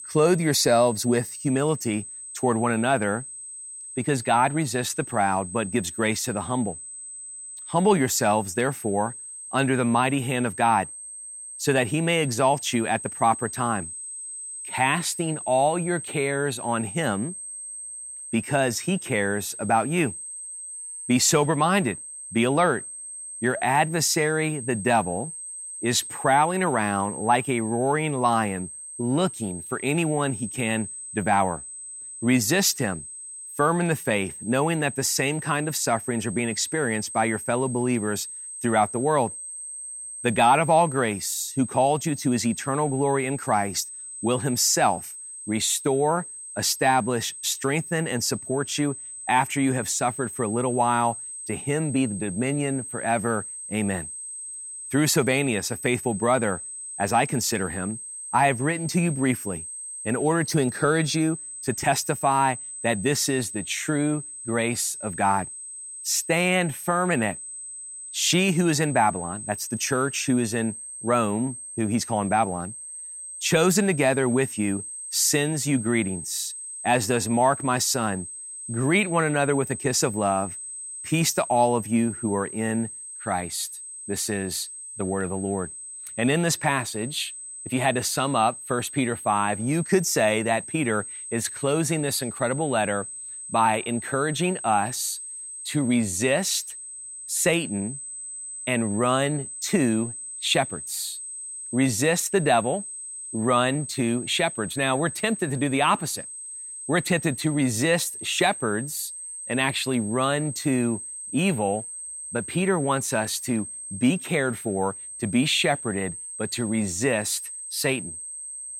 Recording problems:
high-pitched whine; loud; throughout; 8 kHz, 10 dB below the speech

